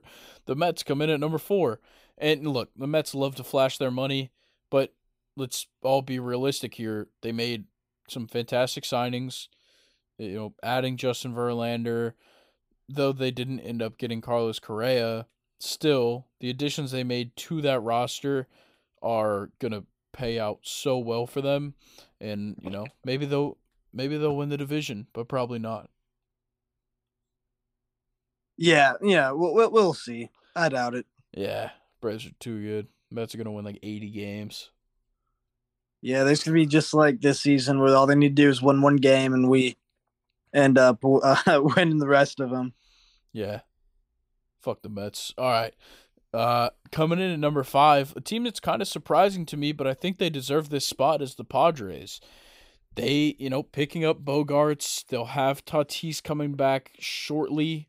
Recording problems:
none

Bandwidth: 15.5 kHz